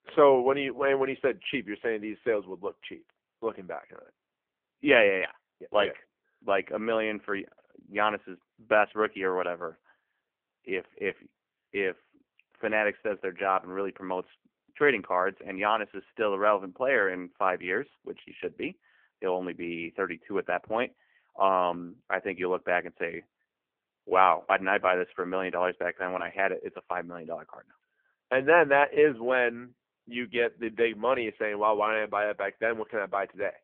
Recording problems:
phone-call audio; poor line; nothing above 3 kHz

